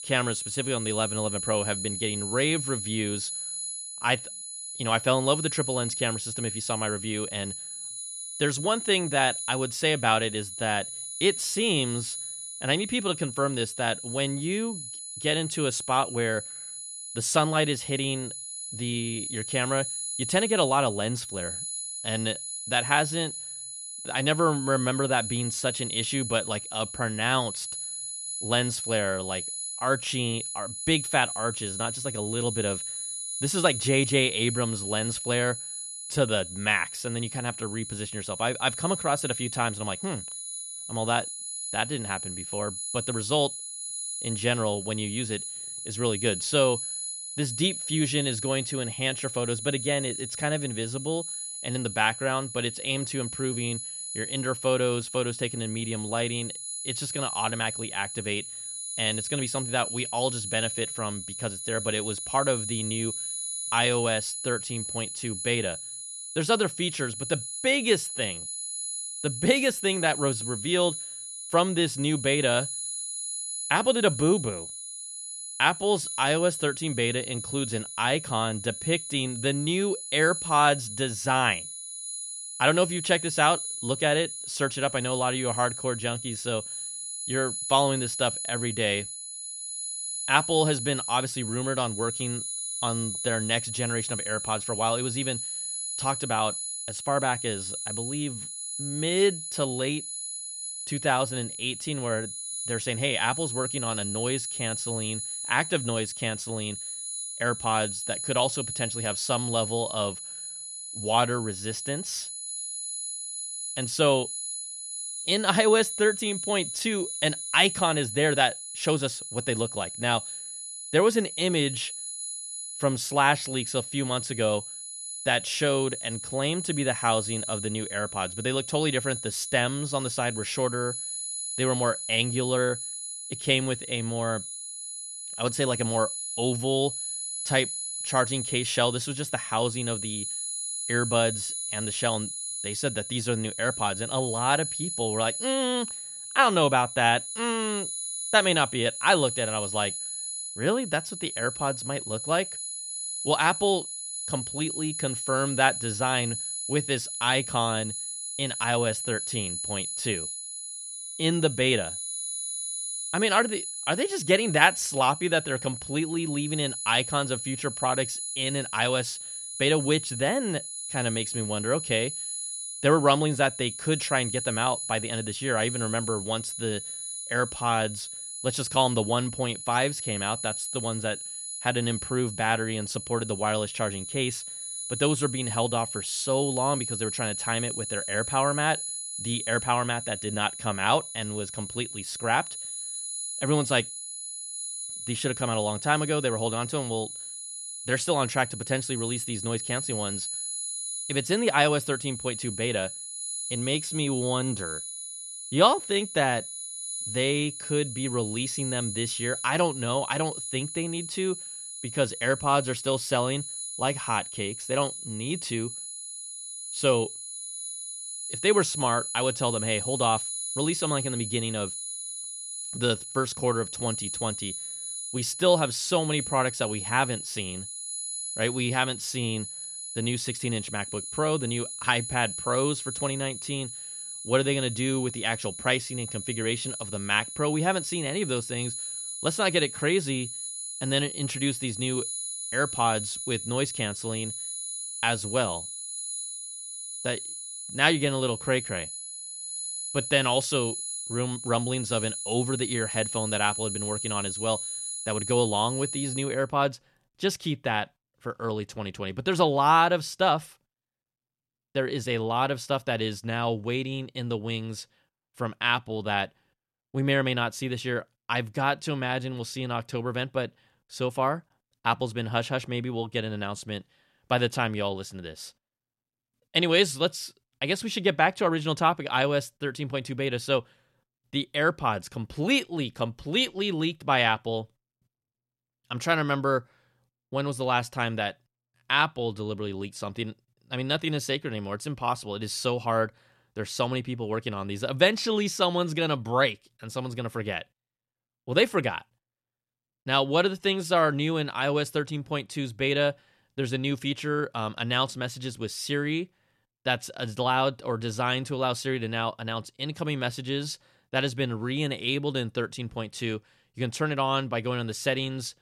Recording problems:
high-pitched whine; loud; until 4:16; 10 kHz, 5 dB below the speech

